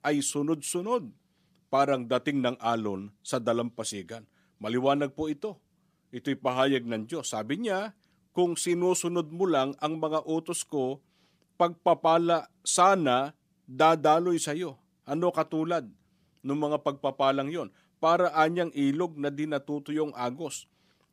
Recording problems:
none

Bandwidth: 15 kHz